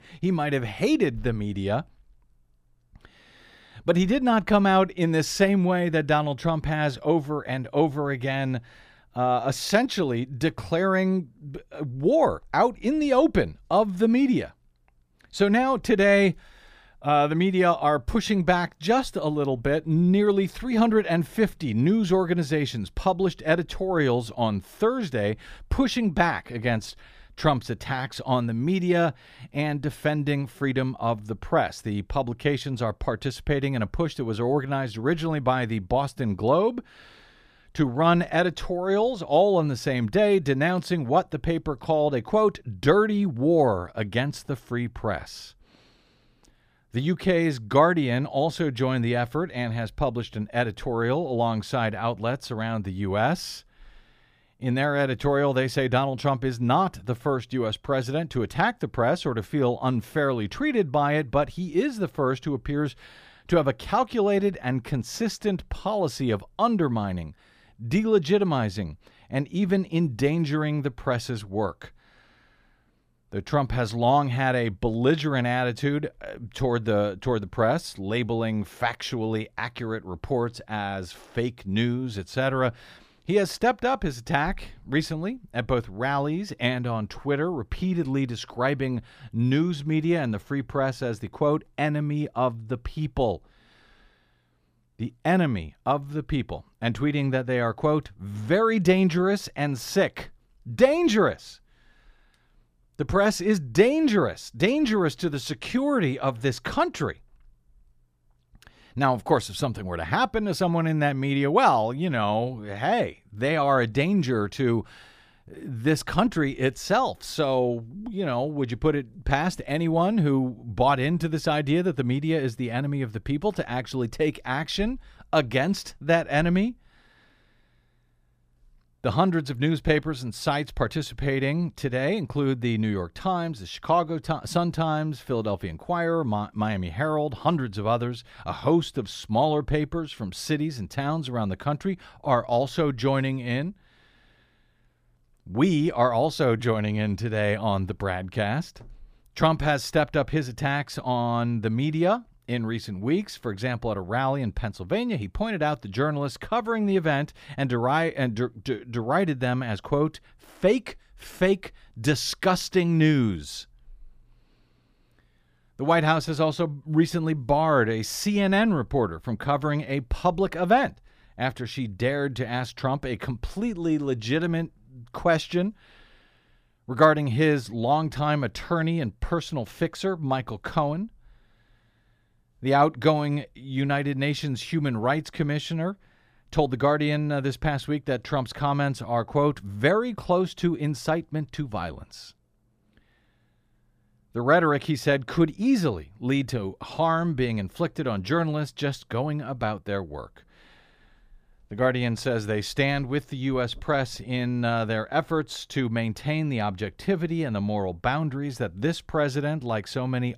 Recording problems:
none

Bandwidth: 15 kHz